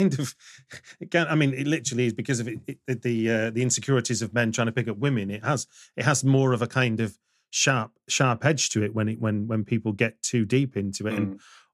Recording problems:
abrupt cut into speech; at the start

